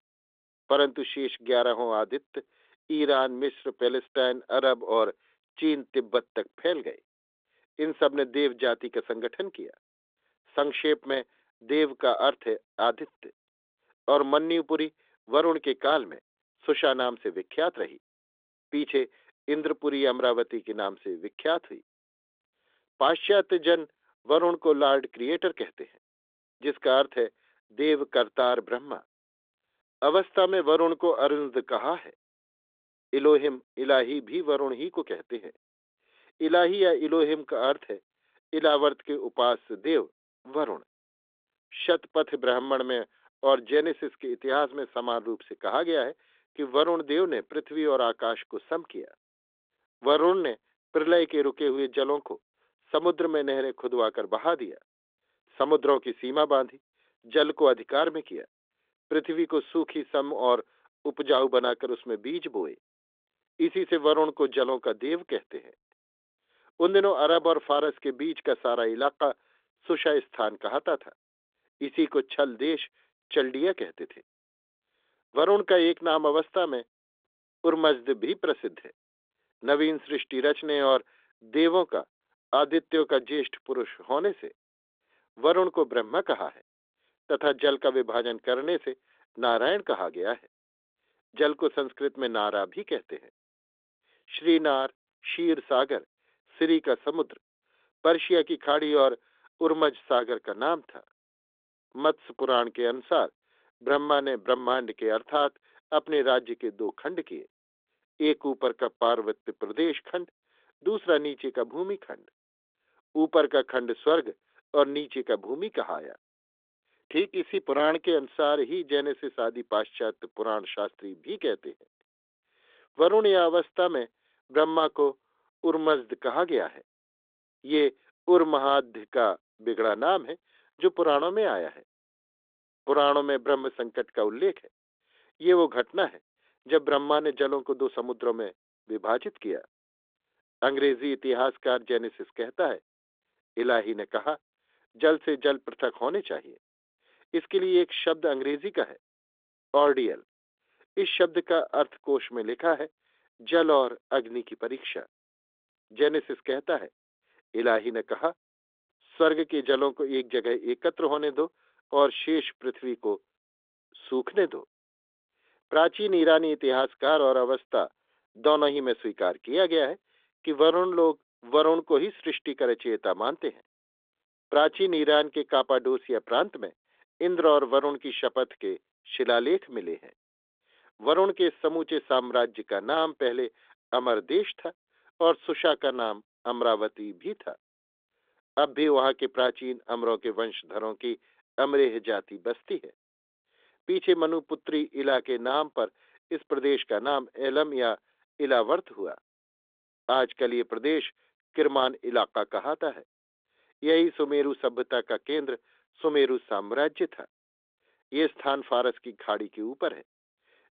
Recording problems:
phone-call audio; nothing above 3.5 kHz

